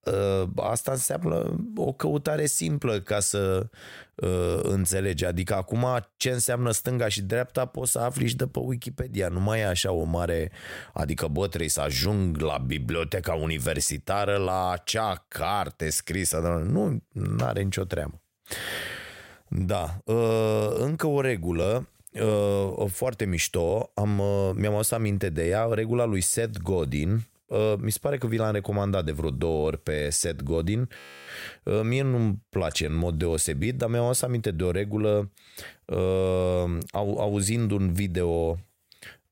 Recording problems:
audio freezing; at 31 s

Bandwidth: 16 kHz